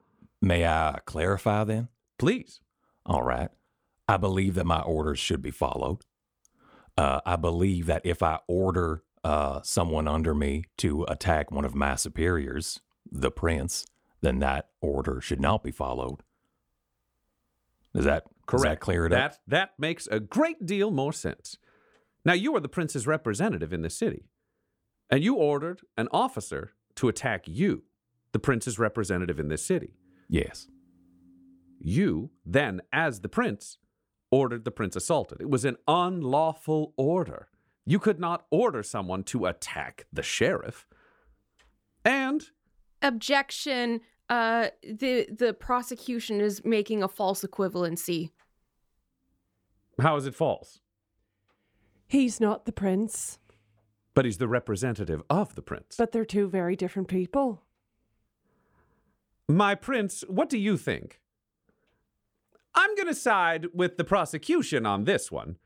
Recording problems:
none

